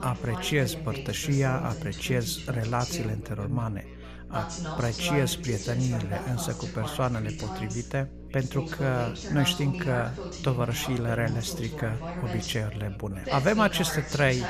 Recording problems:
background chatter; loud; throughout; 2 voices, 7 dB below the speech
electrical hum; faint; throughout; 60 Hz, 20 dB below the speech

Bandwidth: 14.5 kHz